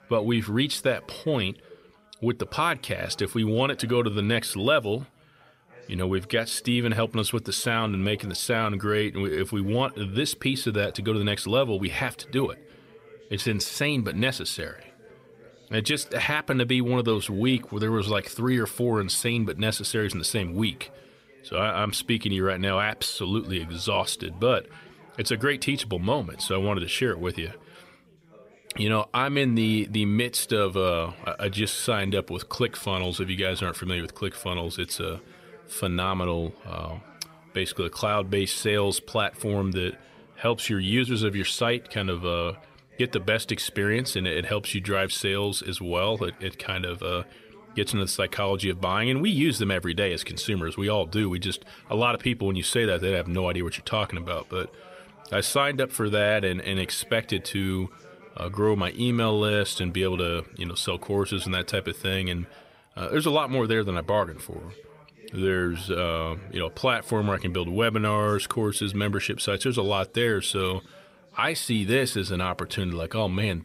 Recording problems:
background chatter; faint; throughout; 3 voices, 25 dB below the speech

